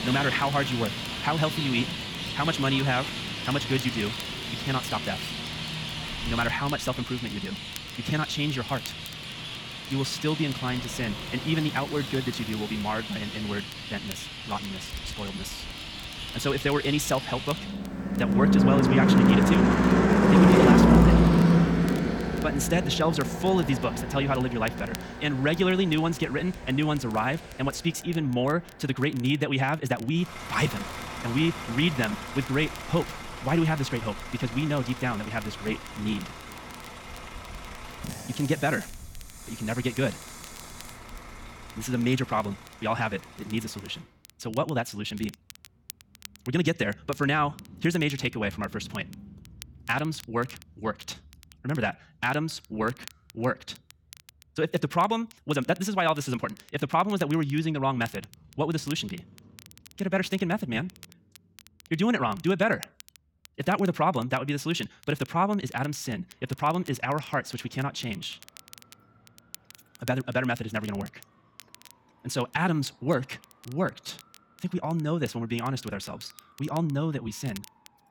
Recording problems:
wrong speed, natural pitch; too fast; 1.6 times normal speed
traffic noise; very loud; throughout; 1 dB above the speech
wind in the background; faint; until 42 s; 25 dB below the speech
crackle, like an old record; faint; 20 dB below the speech

